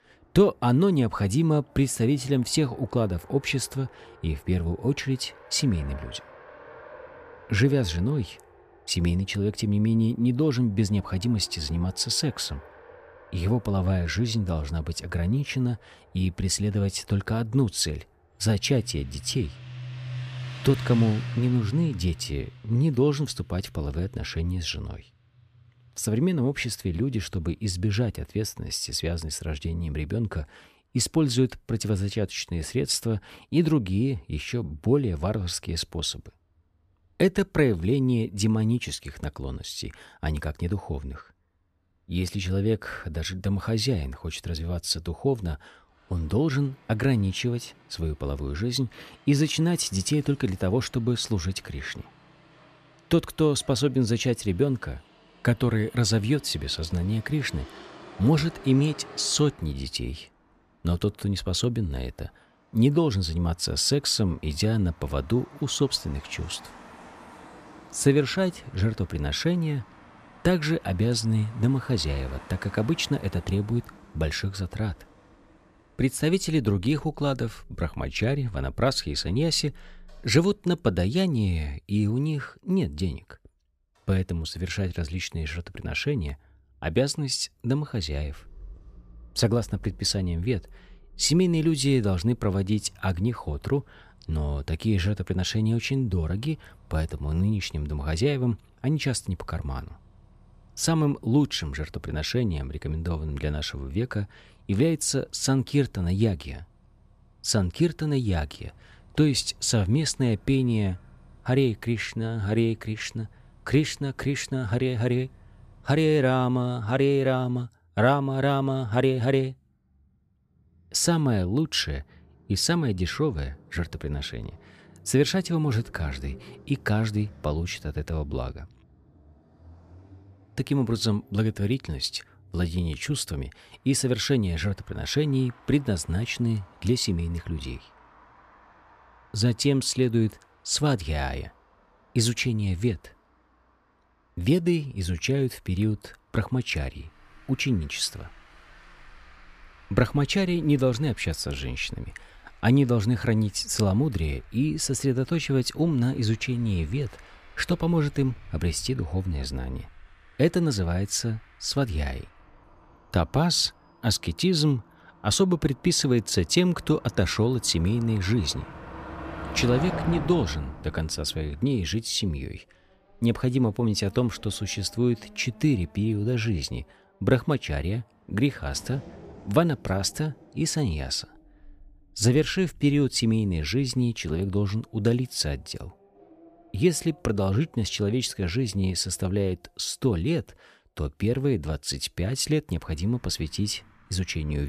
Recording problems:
traffic noise; faint; throughout; 20 dB below the speech
abrupt cut into speech; at the end

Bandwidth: 14.5 kHz